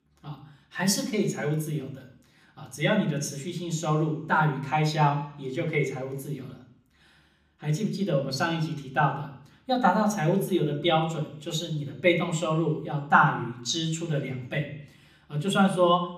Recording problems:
room echo; slight; dies away in 0.6 s
off-mic speech; somewhat distant

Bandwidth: 15 kHz